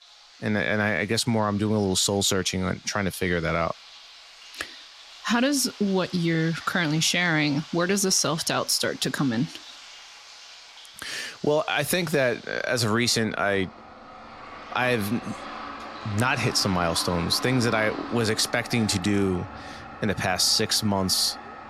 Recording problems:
household noises; noticeable; throughout; 15 dB below the speech

